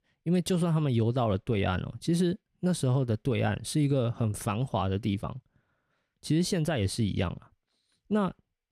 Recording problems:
none

